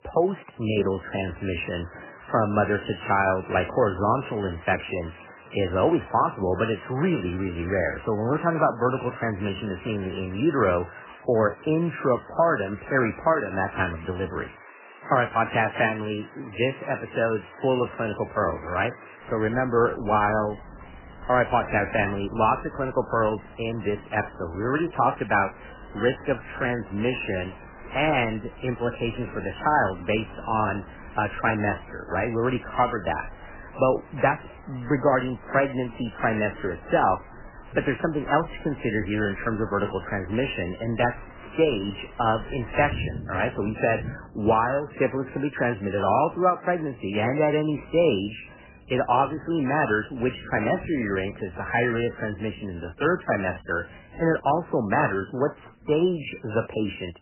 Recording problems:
garbled, watery; badly; nothing above 3 kHz
rain or running water; noticeable; throughout; 20 dB below the speech

